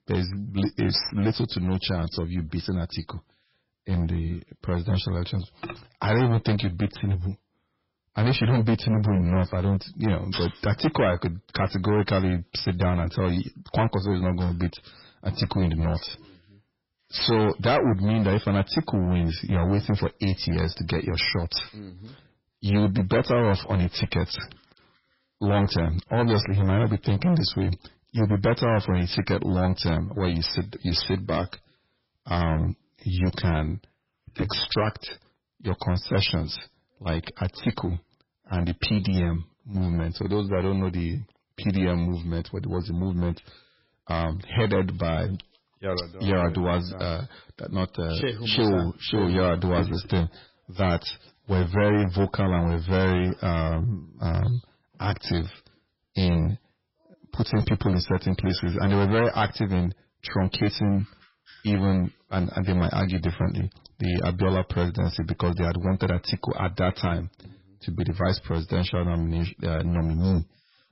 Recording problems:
distortion; heavy; 9% of the sound clipped
garbled, watery; badly; nothing above 5.5 kHz

